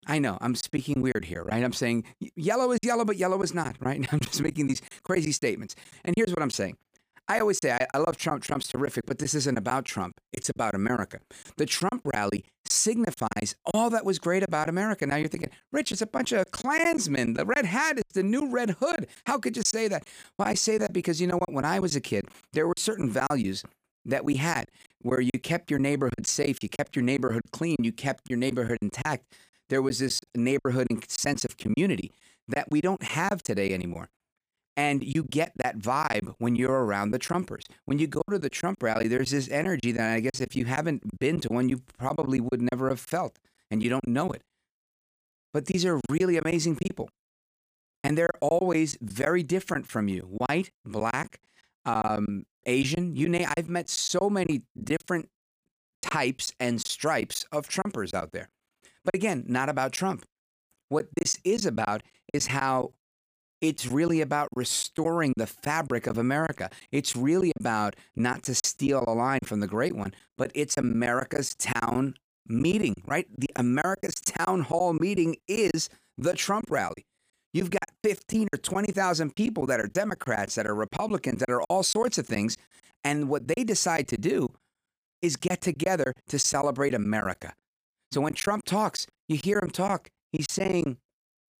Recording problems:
choppy; very; 11% of the speech affected

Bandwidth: 15 kHz